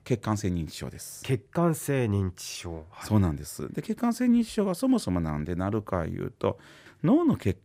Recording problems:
none

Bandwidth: 15.5 kHz